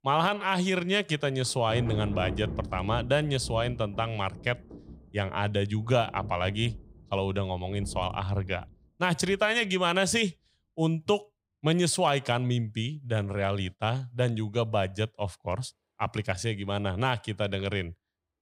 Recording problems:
rain or running water; noticeable; throughout; 10 dB below the speech

